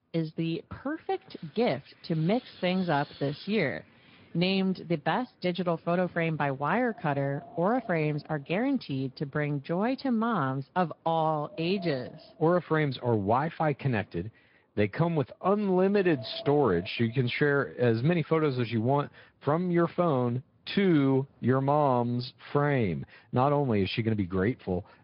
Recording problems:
high frequencies cut off; noticeable; nothing above 5 kHz
garbled, watery; slightly
wind in the background; faint; throughout; 20 dB below the speech

